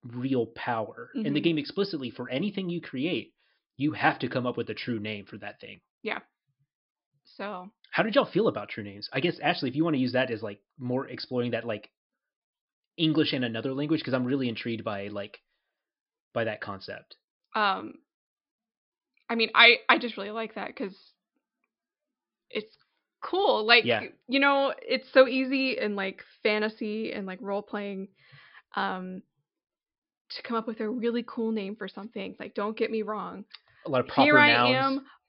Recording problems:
high frequencies cut off; noticeable; nothing above 5 kHz

